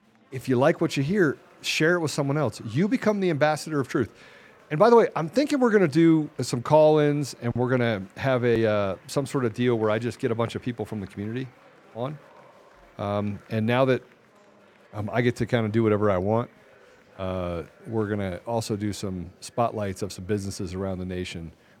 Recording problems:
murmuring crowd; faint; throughout; 30 dB below the speech

